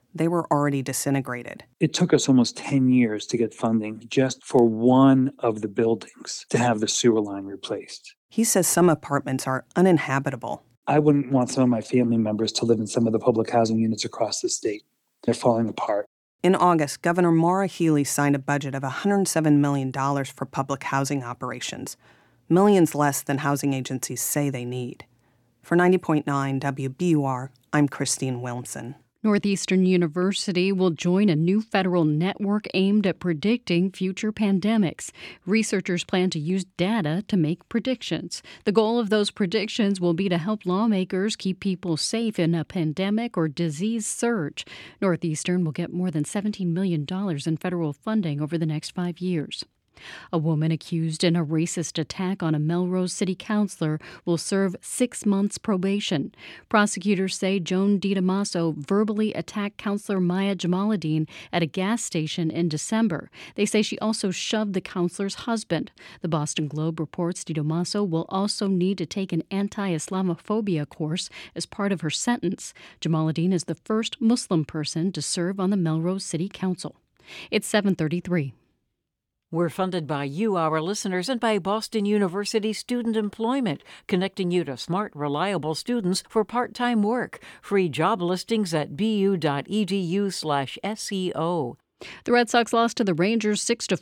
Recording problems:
none

